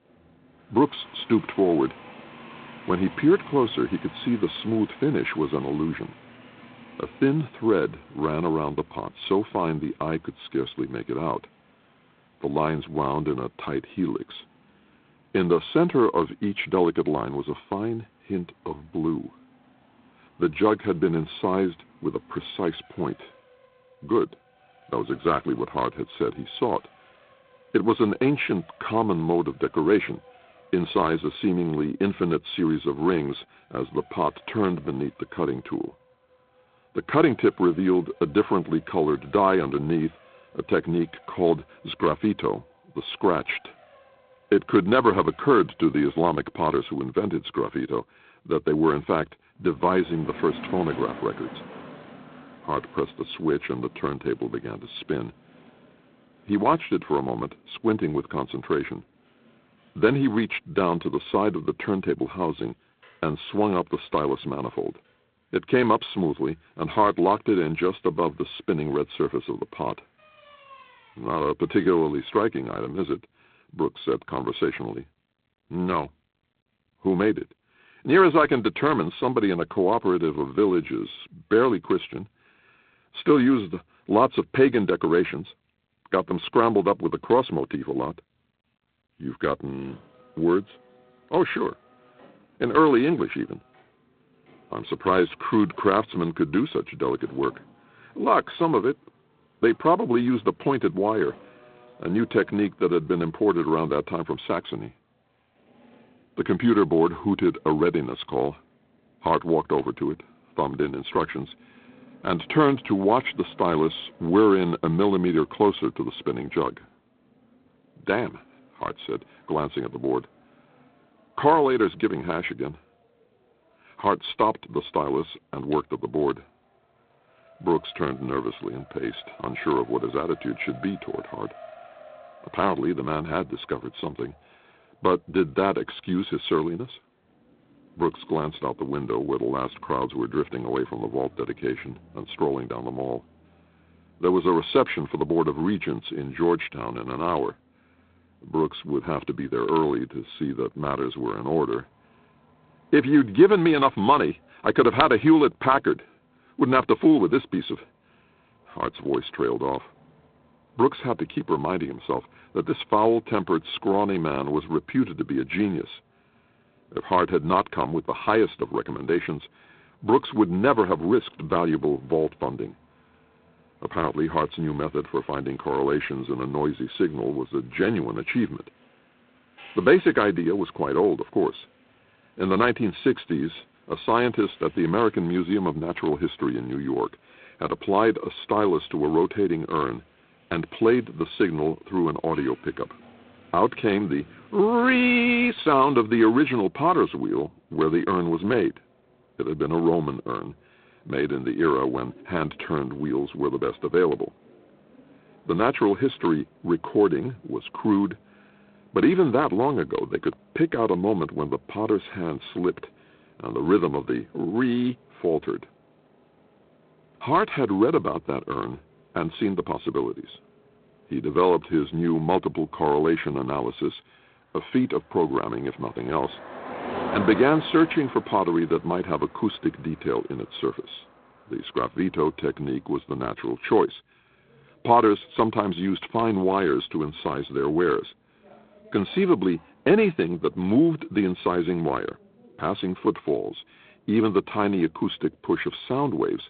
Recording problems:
phone-call audio; poor line; nothing above 3.5 kHz
traffic noise; faint; throughout; 25 dB below the speech

